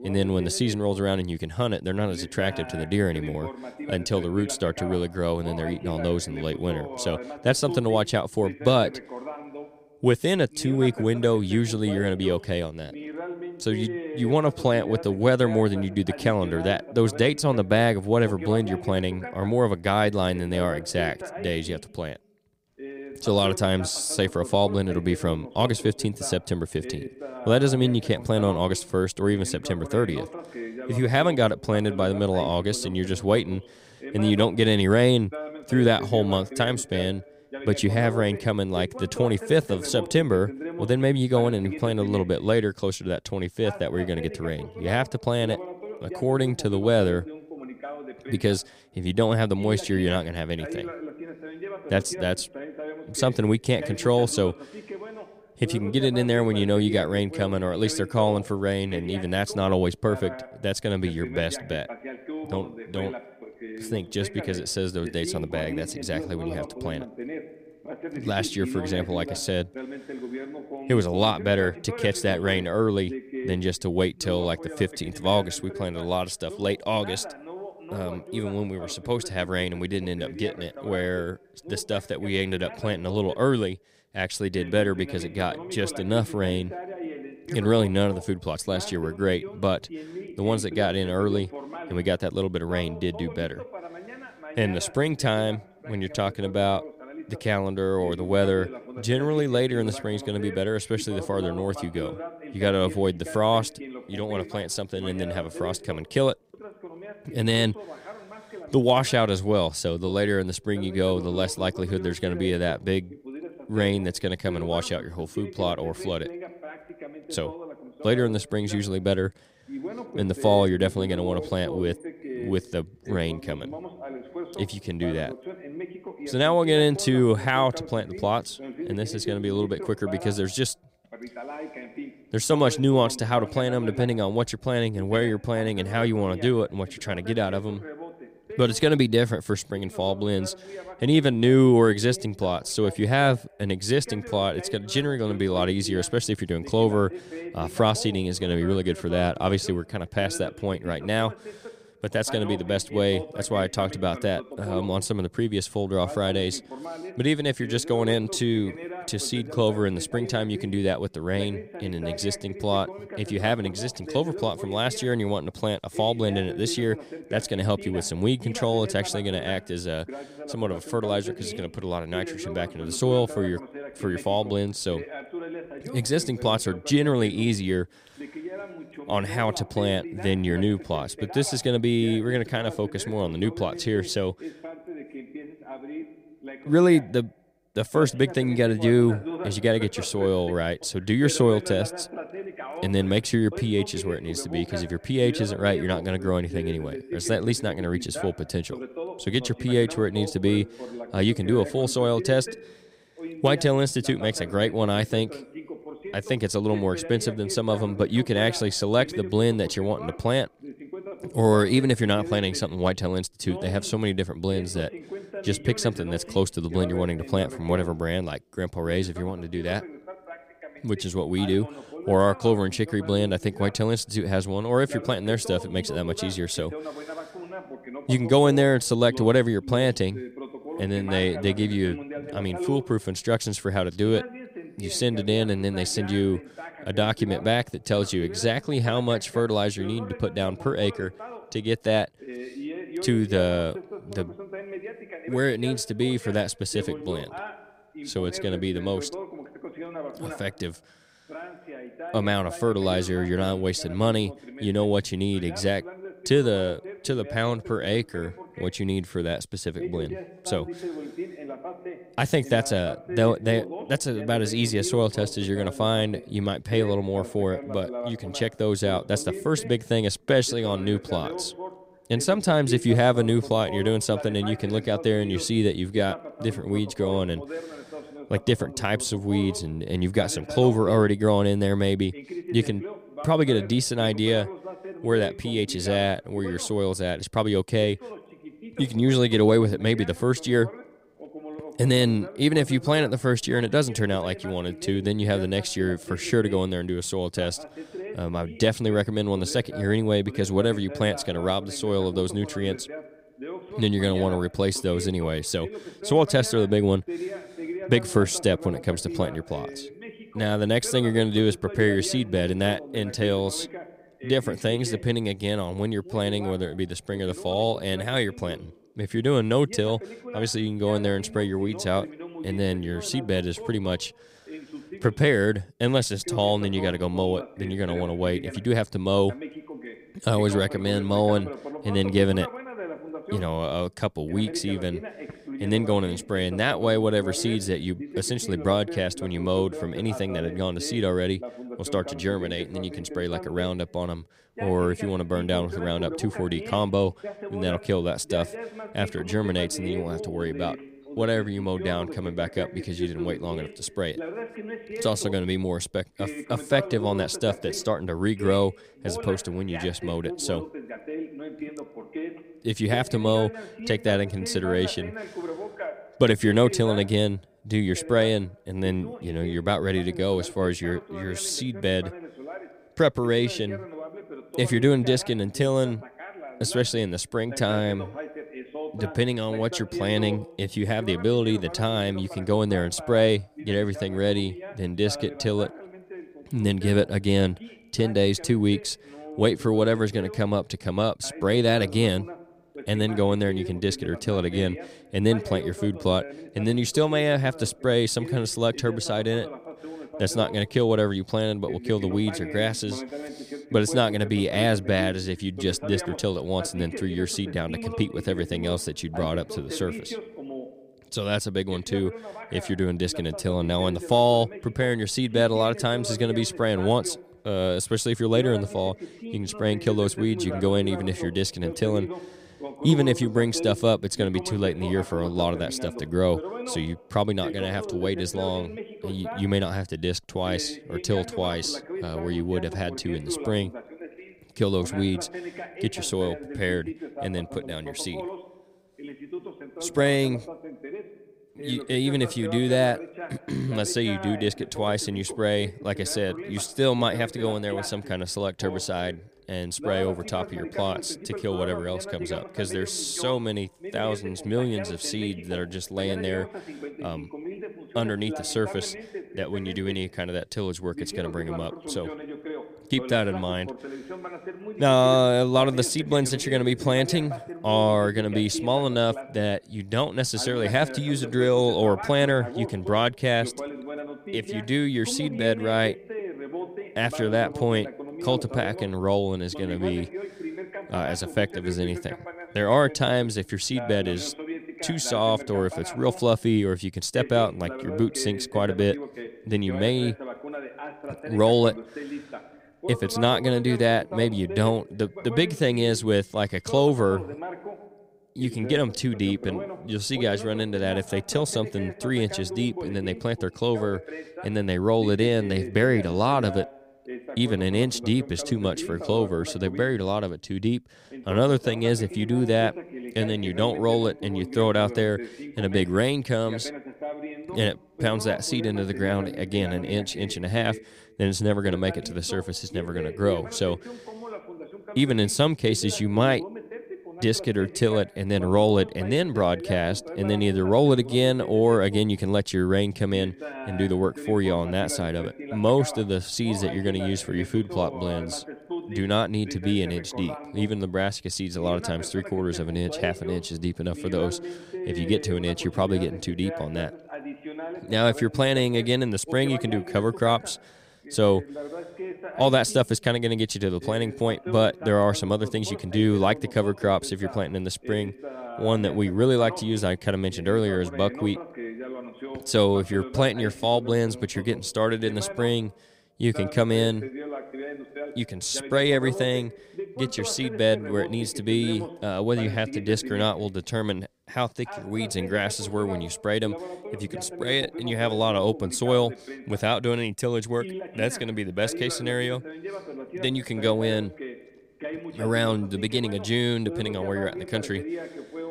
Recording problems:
voice in the background; noticeable; throughout; 15 dB below the speech

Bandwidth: 15.5 kHz